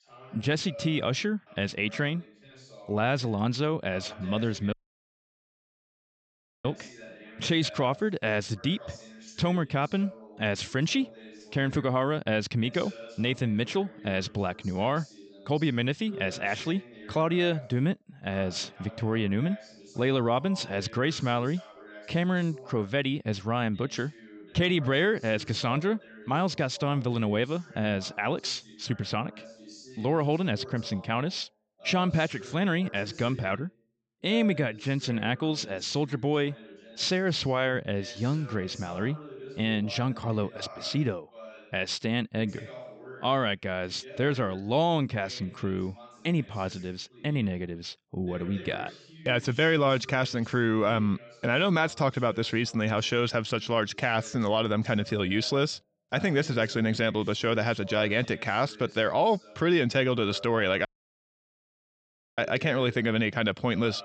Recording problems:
high frequencies cut off; noticeable; nothing above 8 kHz
voice in the background; noticeable; throughout; 20 dB below the speech
audio cutting out; at 4.5 s for 2 s and at 1:01 for 1.5 s

